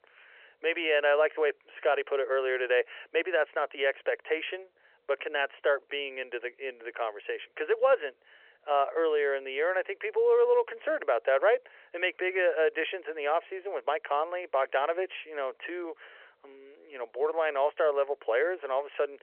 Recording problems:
thin; very; fading below 450 Hz
phone-call audio

